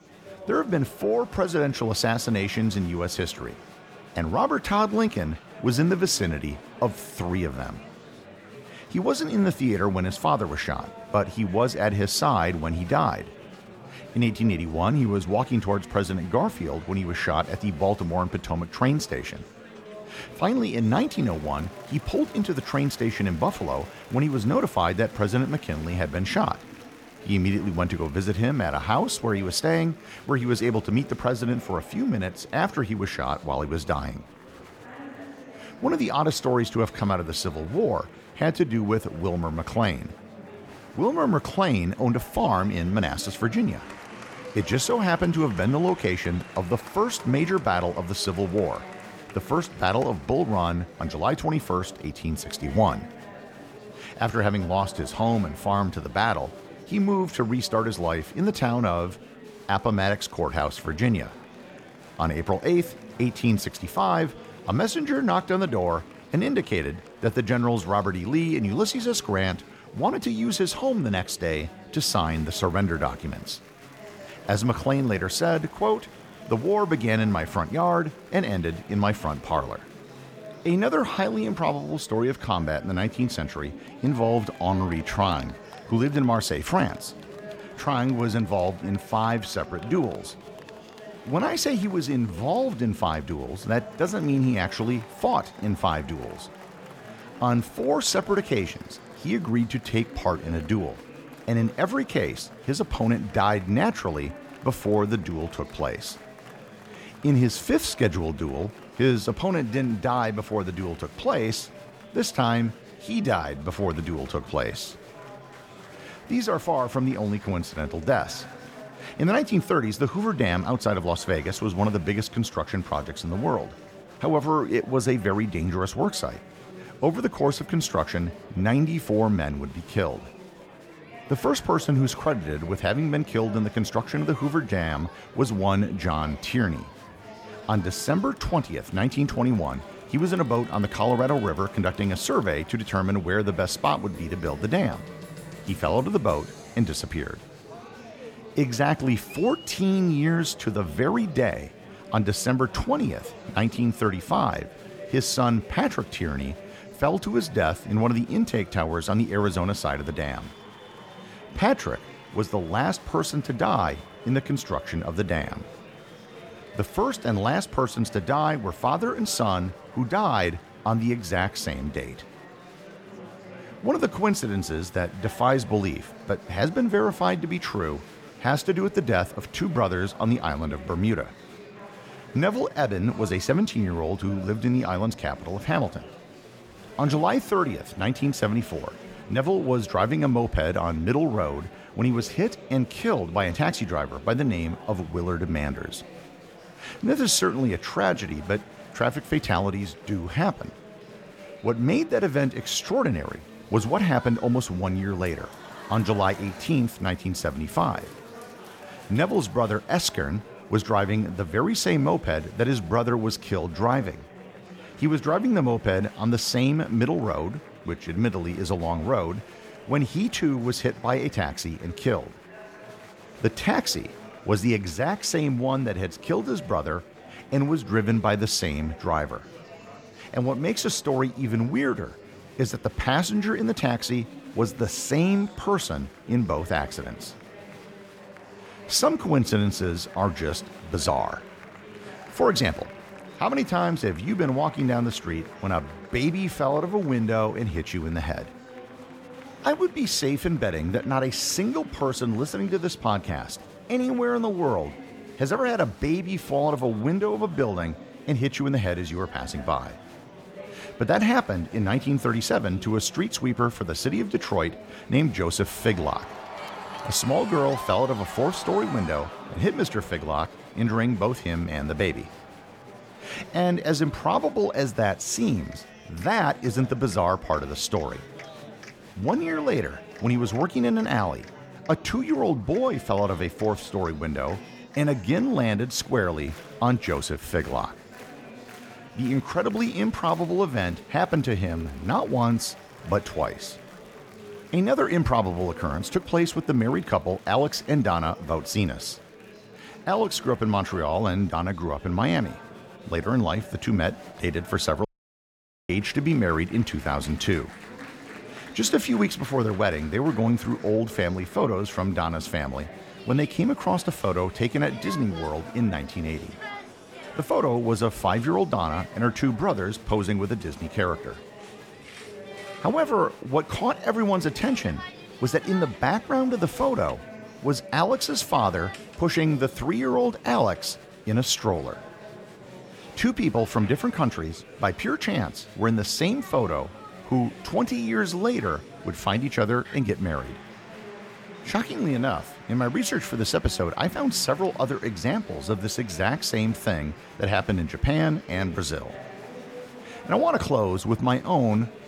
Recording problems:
murmuring crowd; noticeable; throughout; 20 dB below the speech
audio cutting out; at 5:05 for 1 s

